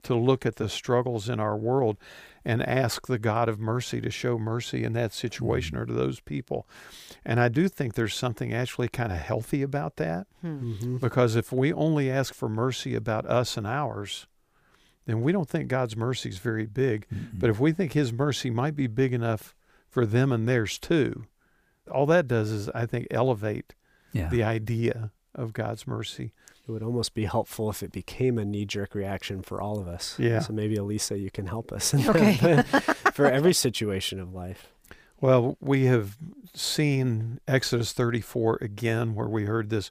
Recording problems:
none

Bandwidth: 15 kHz